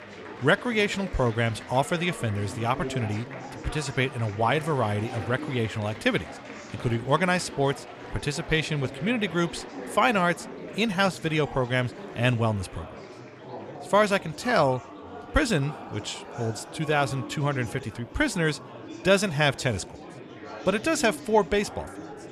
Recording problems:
murmuring crowd; noticeable; throughout; 15 dB below the speech

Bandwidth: 14.5 kHz